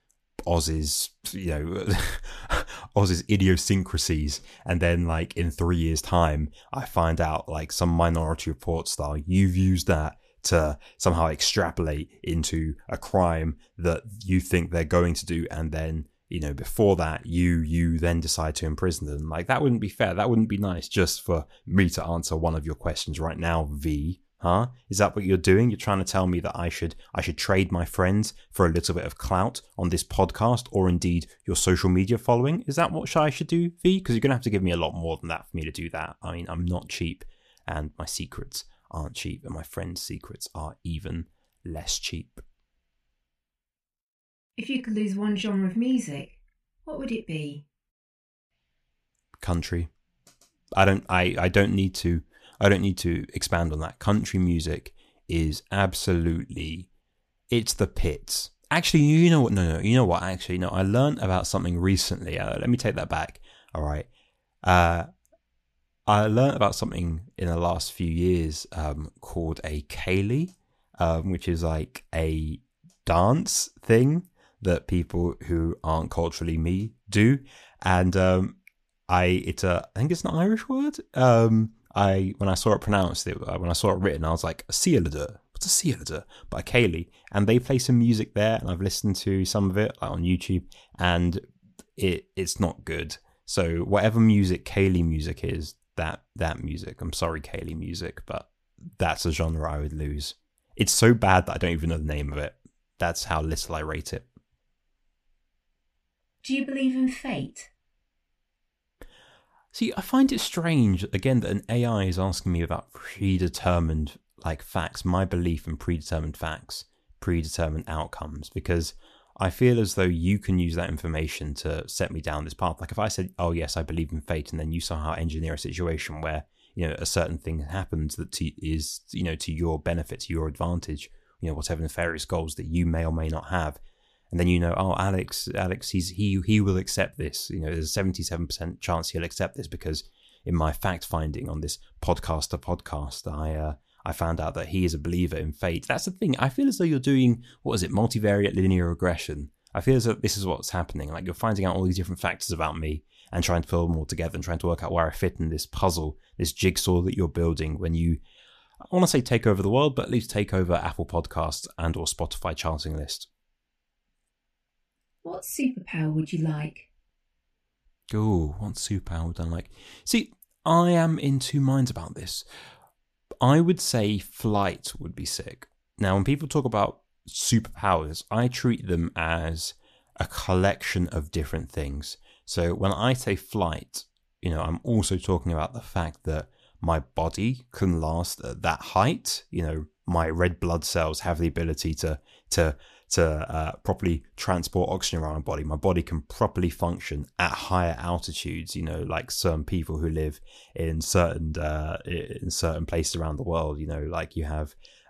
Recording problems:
none

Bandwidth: 14 kHz